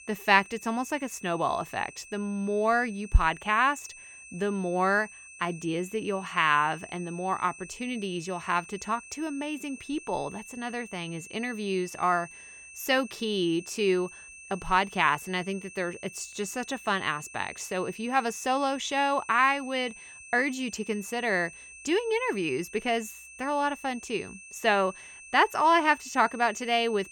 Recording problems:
high-pitched whine; noticeable; throughout; 2.5 kHz, 15 dB below the speech

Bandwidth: 18.5 kHz